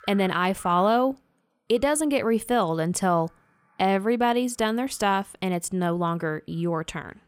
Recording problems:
animal sounds; faint; throughout; 30 dB below the speech

